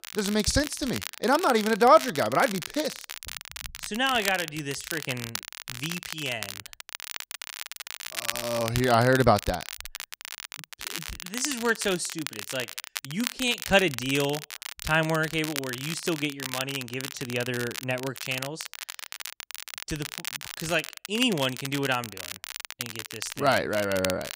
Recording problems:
crackle, like an old record; loud; 9 dB below the speech

